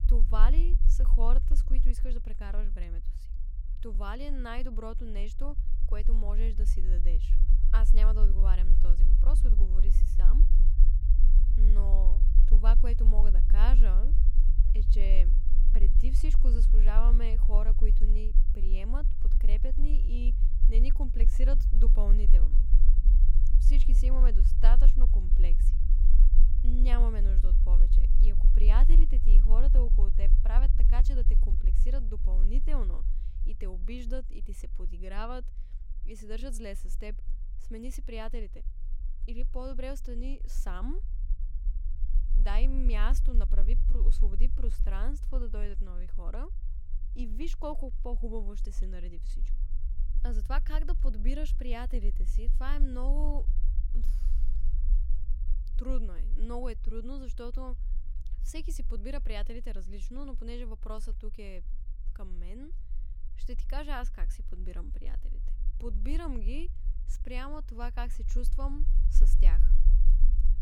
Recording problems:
low rumble; loud; throughout; 10 dB below the speech

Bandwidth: 16 kHz